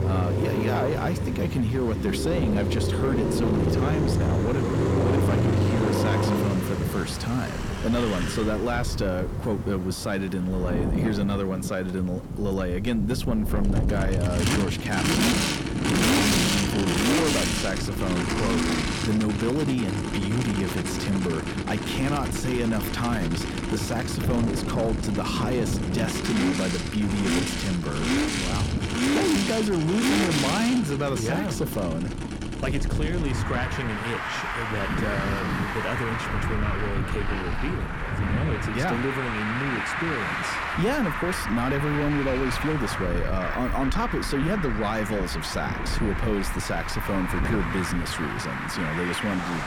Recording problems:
distortion; slight; 10 dB below the speech
traffic noise; very loud; throughout; 1 dB above the speech
wind noise on the microphone; occasional gusts; 10 dB below the speech

